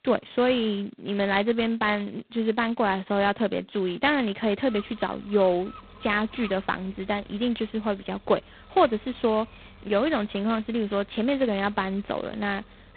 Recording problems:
phone-call audio; poor line; nothing above 4 kHz
animal sounds; faint; throughout; 25 dB below the speech

